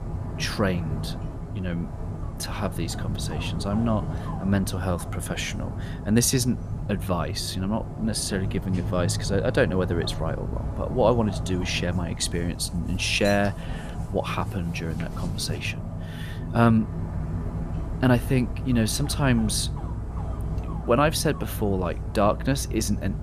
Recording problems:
animal sounds; loud; throughout; 6 dB below the speech

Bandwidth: 14.5 kHz